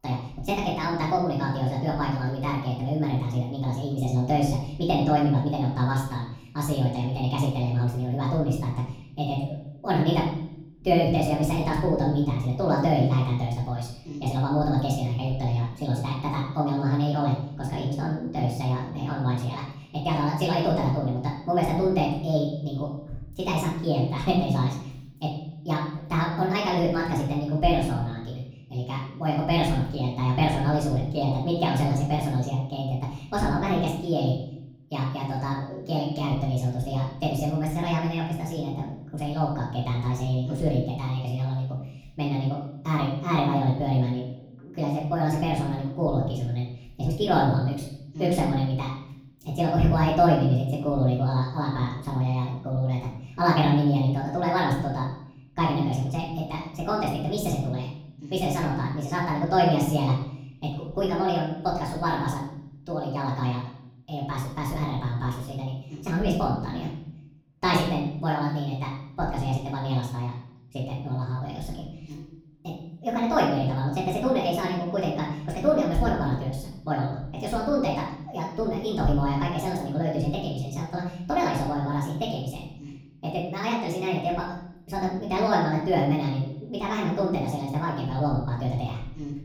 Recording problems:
off-mic speech; far
wrong speed and pitch; too fast and too high; 1.5 times normal speed
room echo; noticeable; dies away in 0.7 s

